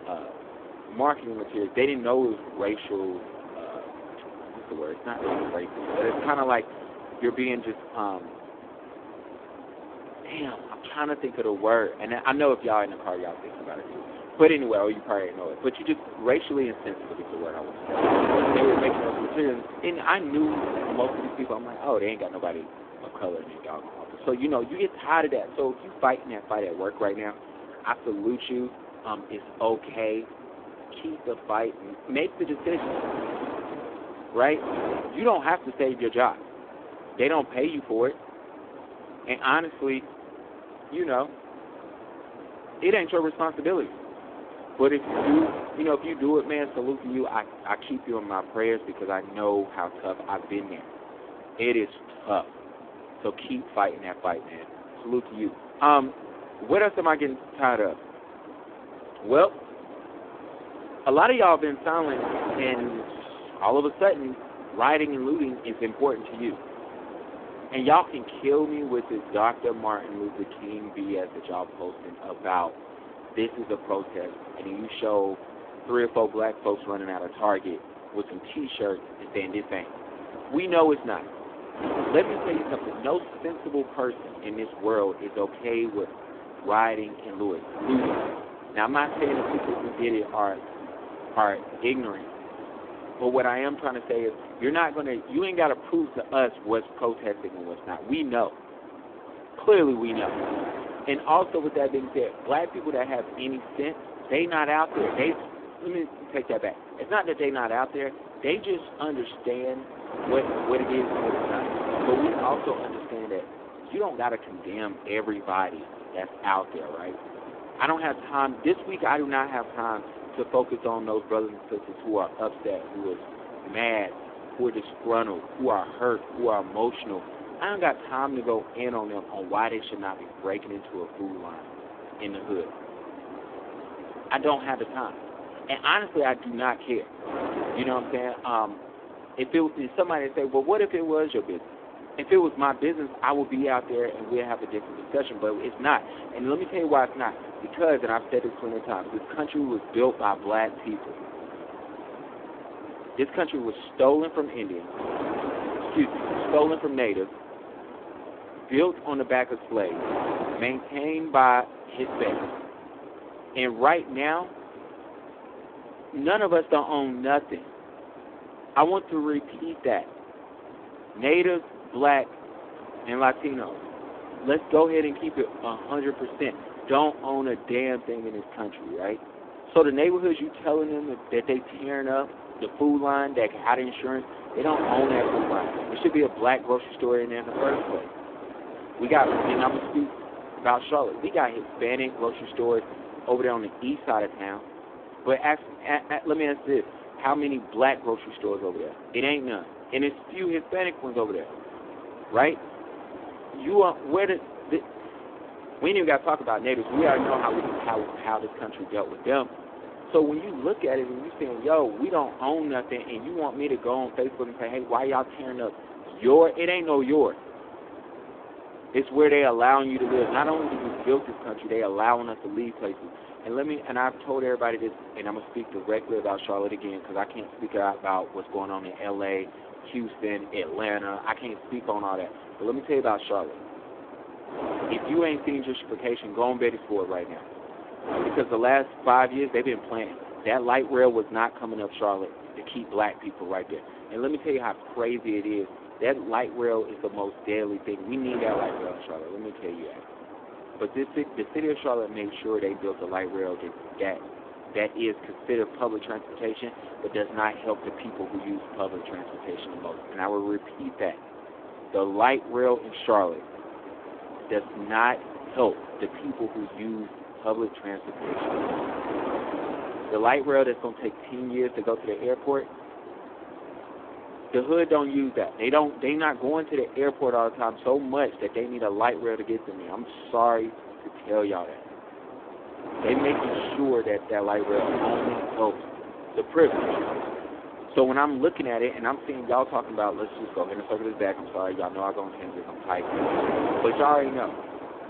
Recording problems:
phone-call audio; poor line
wind noise on the microphone; occasional gusts; 10 dB below the speech

